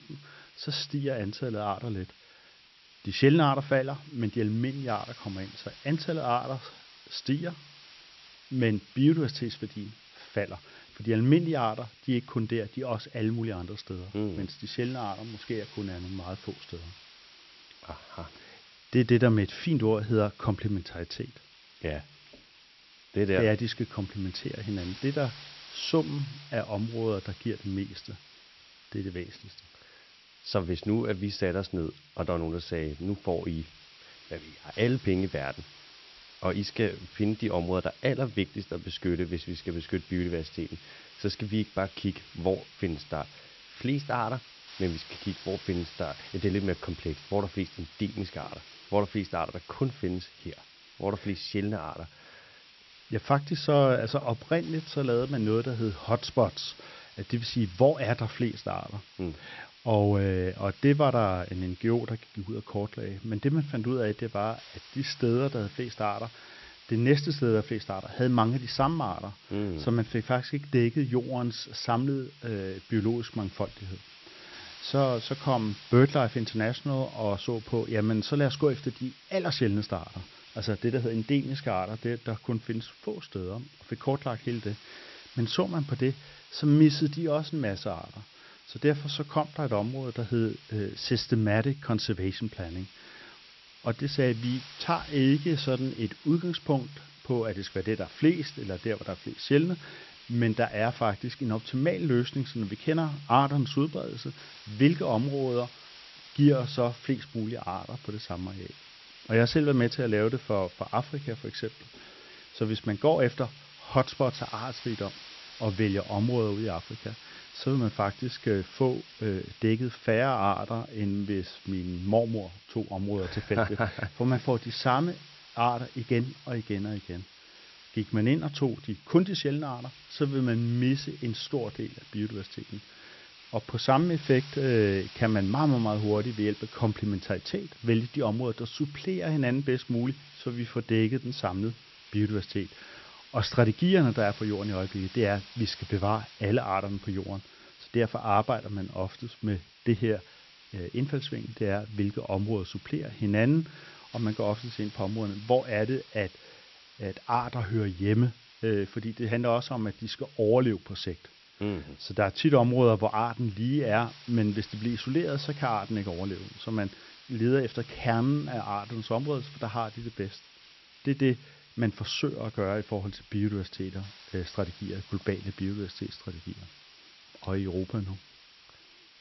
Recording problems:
high frequencies cut off; noticeable; nothing above 5.5 kHz
hiss; noticeable; throughout; 20 dB below the speech

